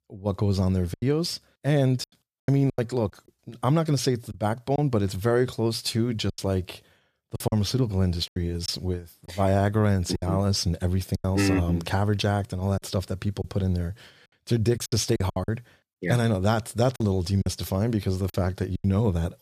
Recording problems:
choppy; very; 8% of the speech affected

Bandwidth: 14.5 kHz